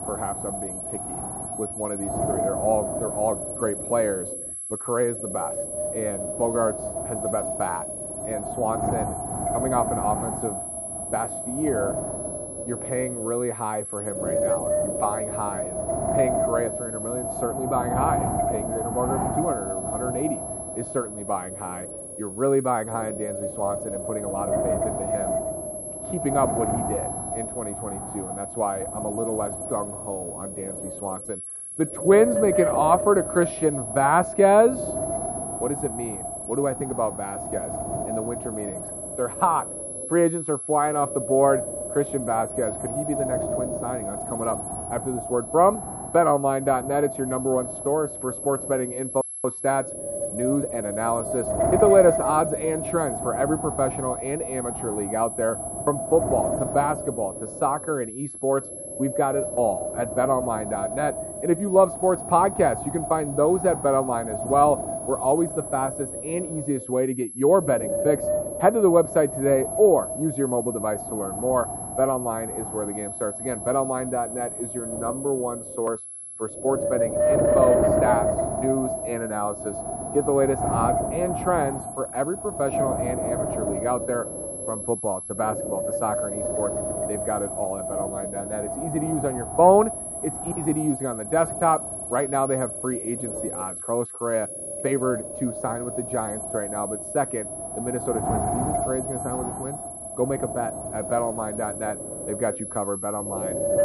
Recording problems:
muffled; very; fading above 3.5 kHz
wind noise on the microphone; heavy; 5 dB below the speech
high-pitched whine; loud; throughout; 11 kHz, 8 dB below the speech

